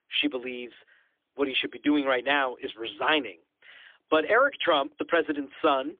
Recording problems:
phone-call audio; poor line; nothing above 3.5 kHz

